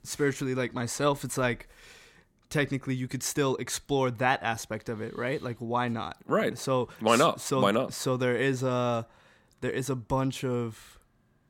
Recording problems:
none

